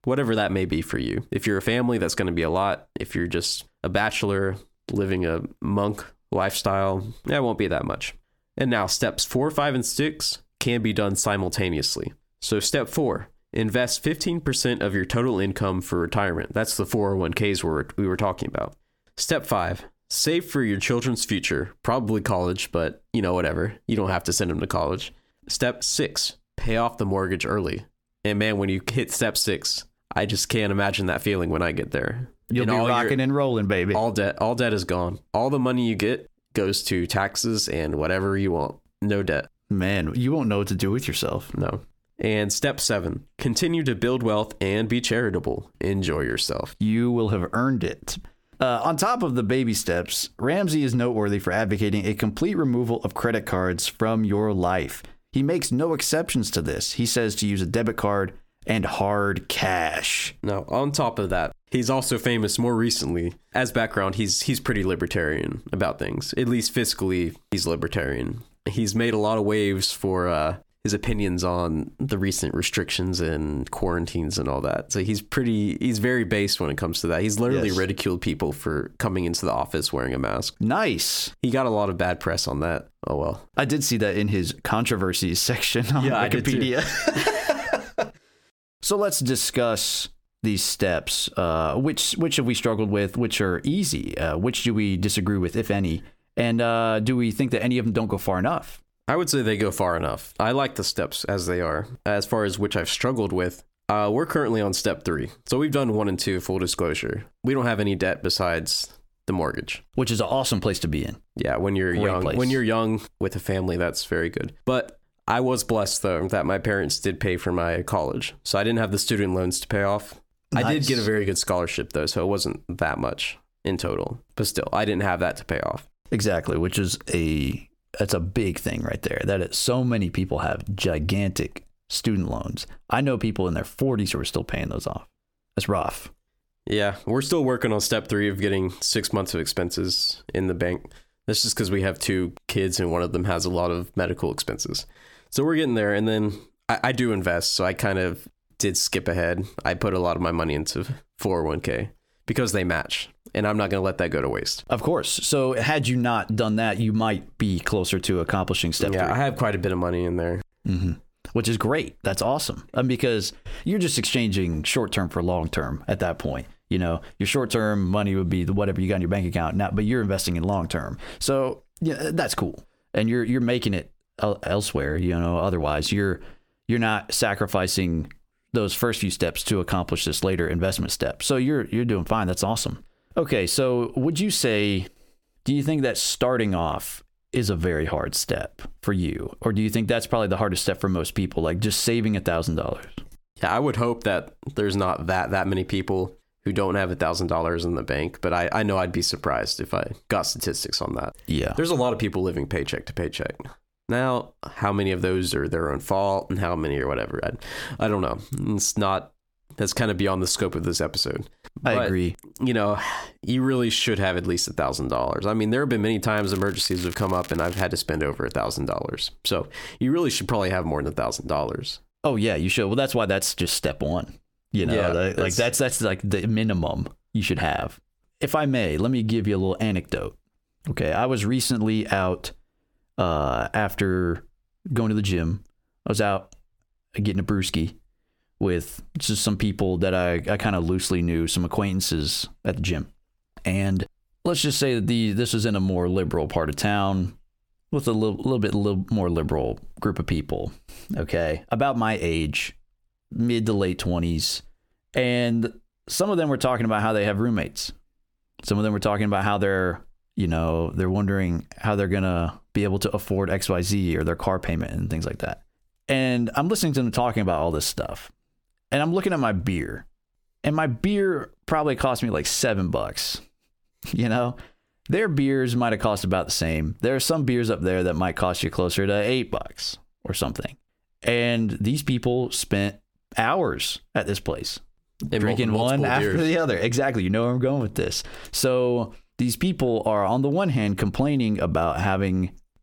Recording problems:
squashed, flat; heavily
crackling; noticeable; from 3:36 to 3:38; 15 dB below the speech

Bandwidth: 18 kHz